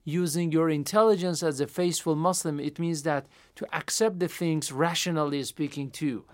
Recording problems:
none

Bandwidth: 16 kHz